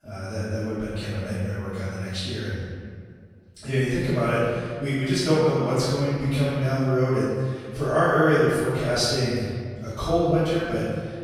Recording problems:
room echo; strong; dies away in 1.8 s
off-mic speech; far

